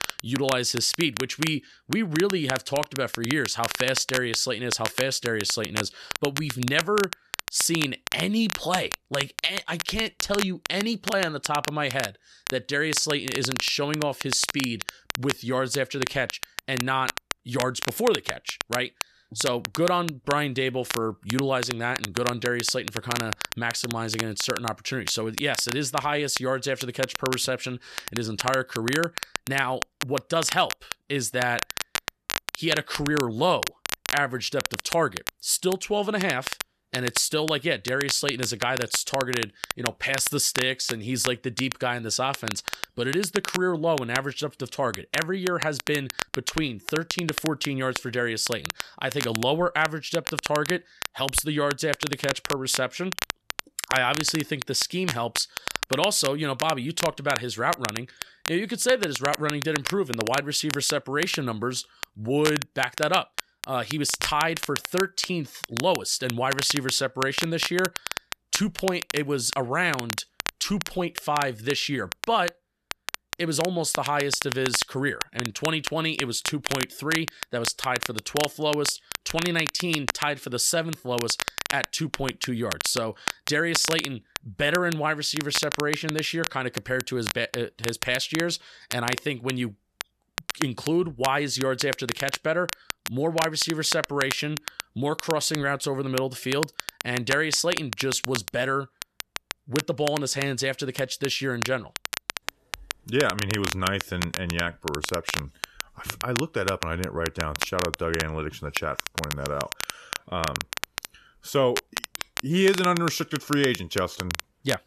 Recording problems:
crackle, like an old record; loud; 6 dB below the speech

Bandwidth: 13.5 kHz